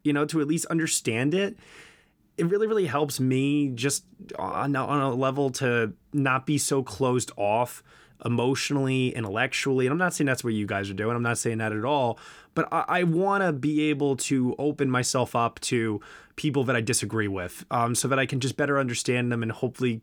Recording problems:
none

